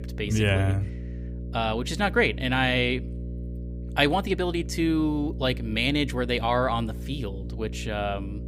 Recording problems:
electrical hum; noticeable; throughout; 60 Hz, 20 dB below the speech

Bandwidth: 15.5 kHz